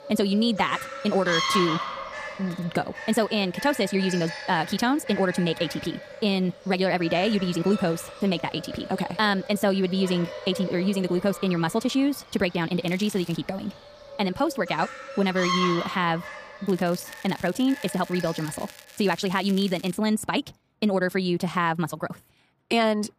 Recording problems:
wrong speed, natural pitch; too fast; 1.7 times normal speed
animal sounds; loud; until 18 s; 9 dB below the speech
crackling; faint; at 13 s and from 17 to 20 s; 20 dB below the speech

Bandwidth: 15 kHz